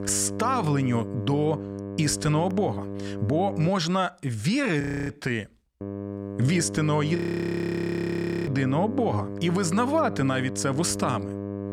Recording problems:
electrical hum; noticeable; until 3.5 s and from 6 s on; 50 Hz, 10 dB below the speech
audio freezing; at 5 s and at 7 s for 1.5 s

